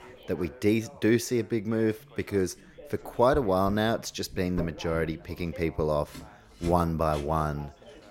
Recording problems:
household noises; noticeable; throughout; 15 dB below the speech
background chatter; faint; throughout; 3 voices, 20 dB below the speech

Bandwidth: 16 kHz